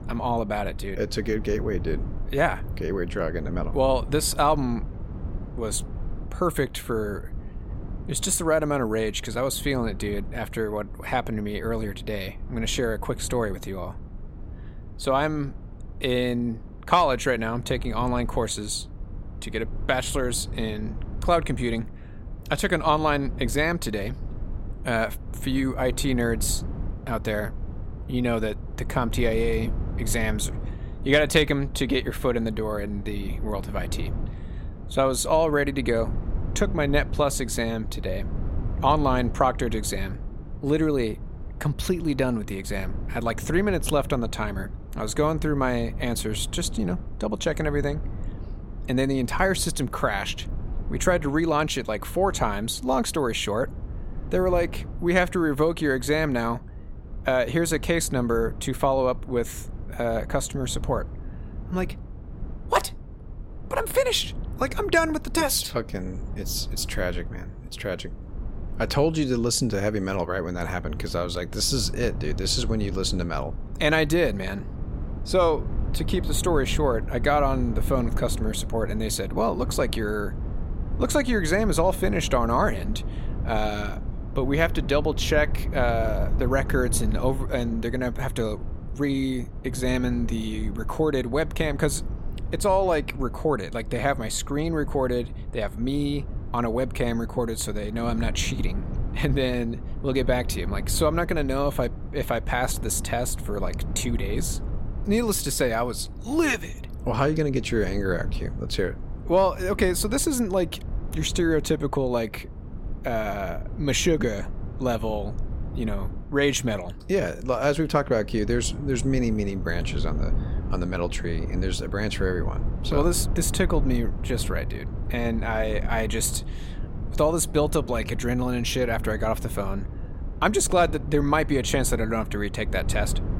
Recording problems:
low rumble; noticeable; throughout; 20 dB below the speech

